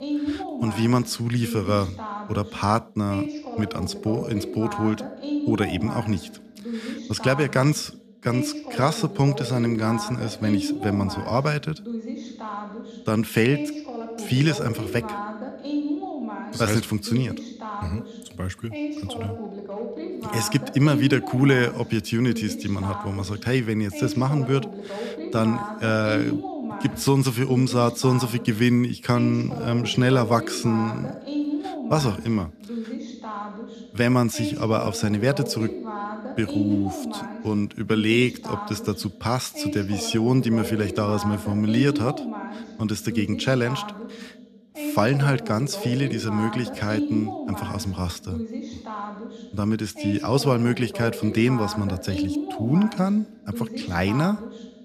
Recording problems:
voice in the background; loud; throughout; 8 dB below the speech

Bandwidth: 14.5 kHz